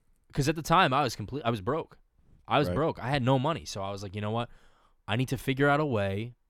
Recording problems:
none

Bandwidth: 17.5 kHz